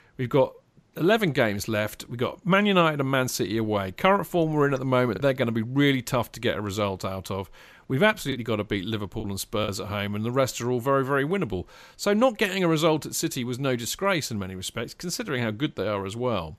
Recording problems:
choppy; occasionally; at 5 s and from 8.5 to 9.5 s; 3% of the speech affected

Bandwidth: 14.5 kHz